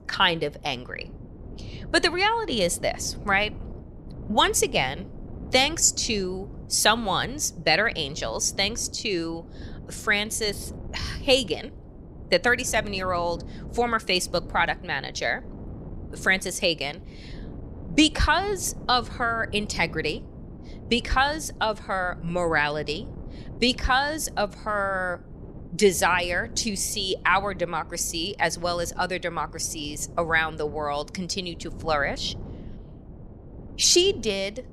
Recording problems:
wind noise on the microphone; occasional gusts; 25 dB below the speech

